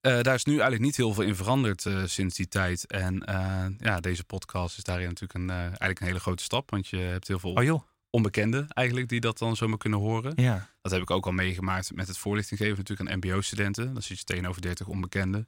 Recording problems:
none

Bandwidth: 16 kHz